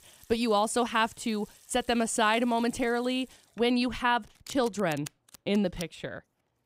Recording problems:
household noises; faint; throughout; 20 dB below the speech

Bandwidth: 15.5 kHz